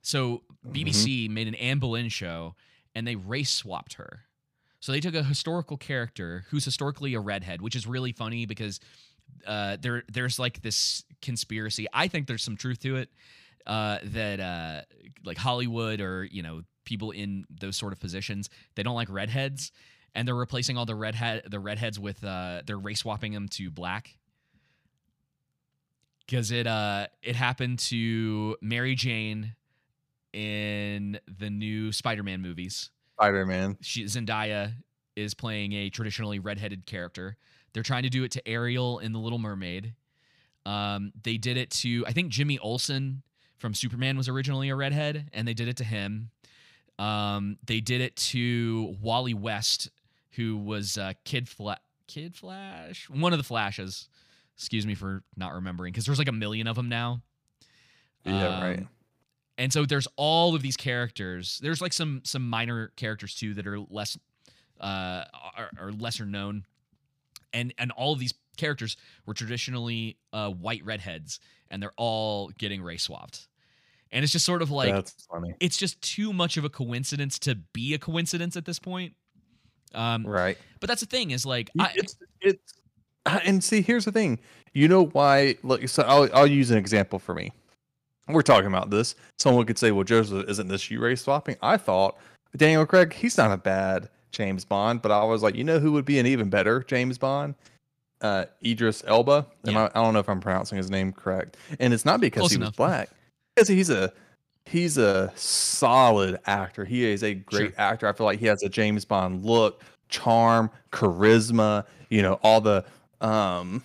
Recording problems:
none

